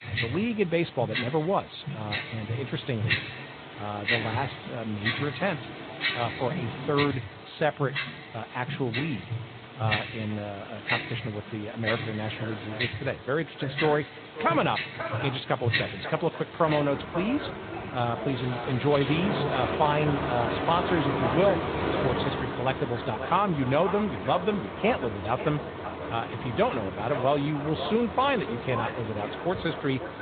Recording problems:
echo of what is said; strong; from 12 s on; 540 ms later, 10 dB below the speech
high frequencies cut off; severe; nothing above 4 kHz
garbled, watery; slightly
household noises; loud; throughout; 4 dB below the speech

